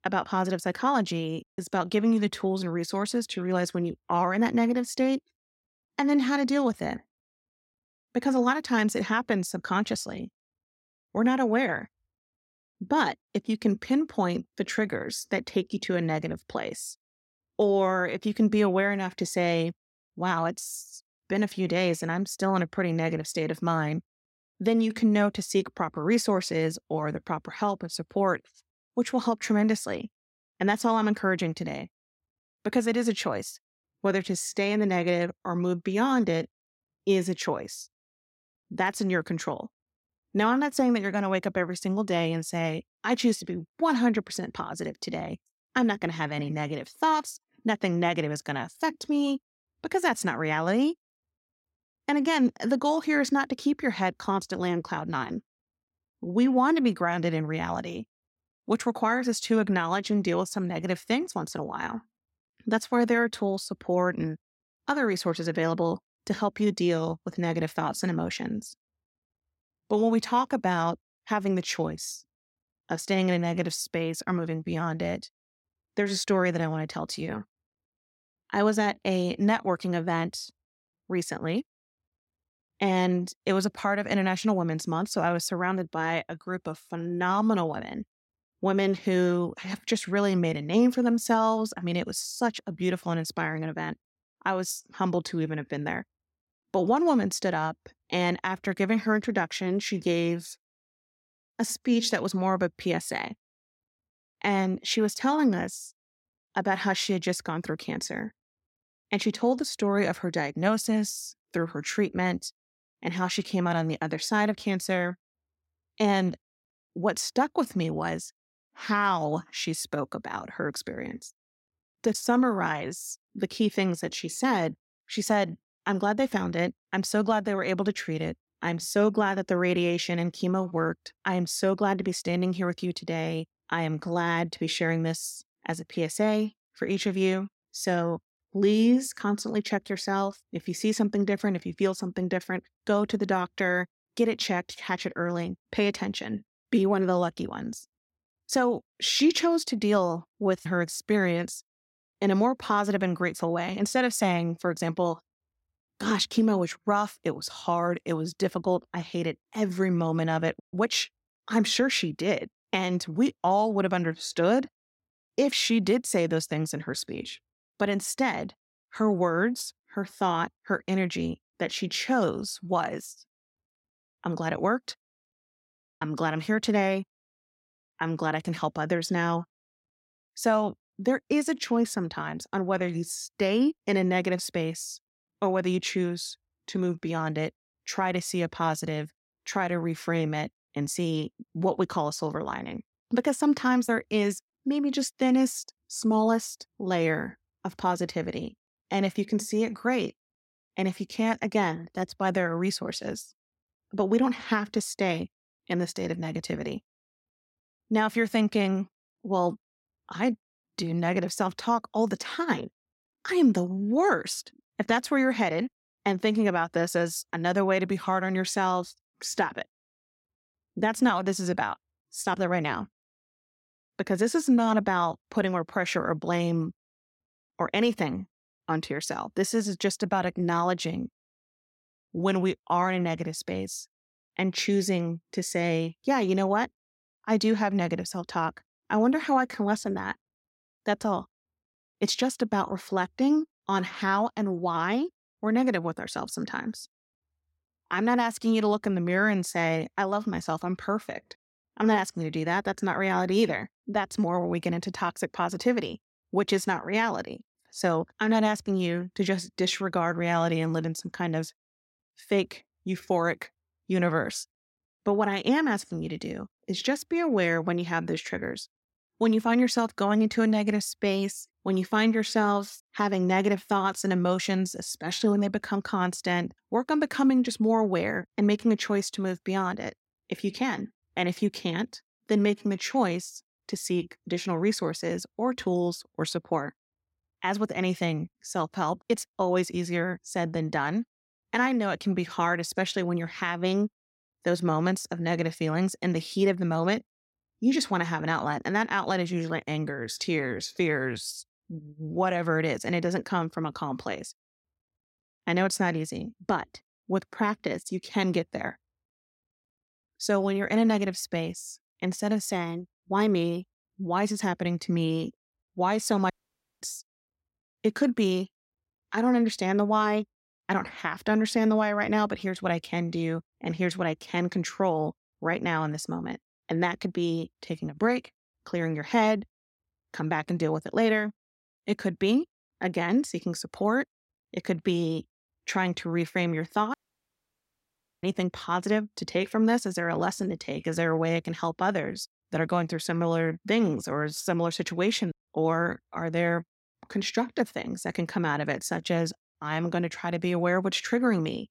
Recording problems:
audio cutting out; at 5:16 for 0.5 s and at 5:37 for 1.5 s

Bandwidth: 16 kHz